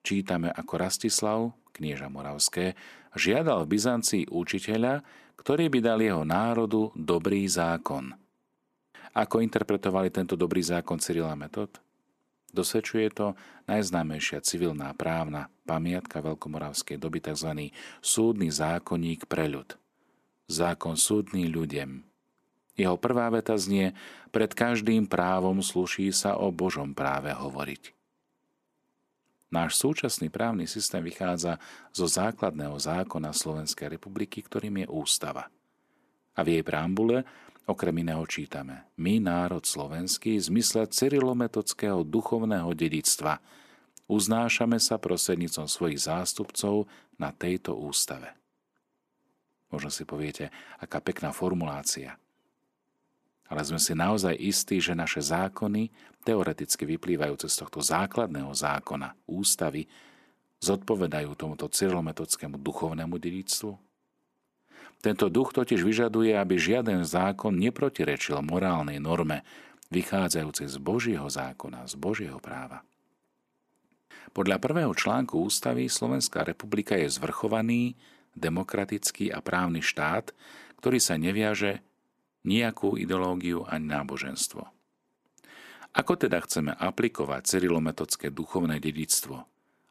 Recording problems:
none

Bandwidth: 14 kHz